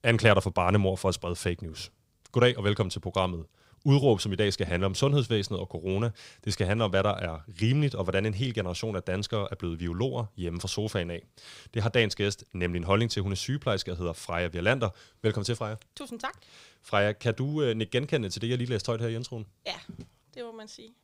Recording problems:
none

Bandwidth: 15.5 kHz